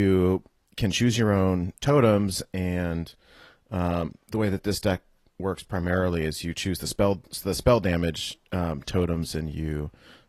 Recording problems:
garbled, watery; slightly; nothing above 12.5 kHz
abrupt cut into speech; at the start

